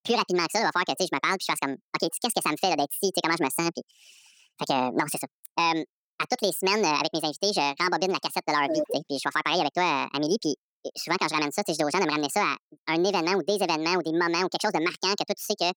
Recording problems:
wrong speed and pitch; too fast and too high; 1.7 times normal speed

